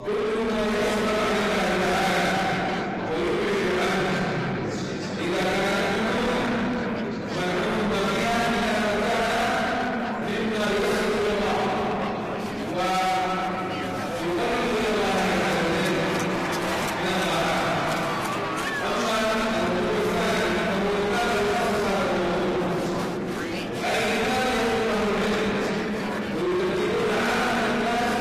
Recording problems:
distortion; heavy; 6 dB below the speech
room echo; strong; dies away in 2.9 s
off-mic speech; far
garbled, watery; slightly; nothing above 15 kHz
chatter from many people; loud; throughout; 7 dB below the speech

